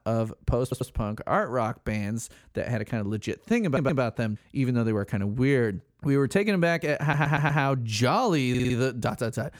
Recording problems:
audio stuttering; 4 times, first at 0.5 s

